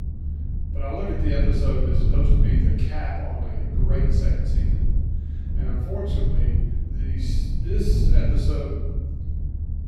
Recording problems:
room echo; strong; dies away in 1.1 s
off-mic speech; far
low rumble; loud; throughout; 4 dB below the speech

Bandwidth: 16.5 kHz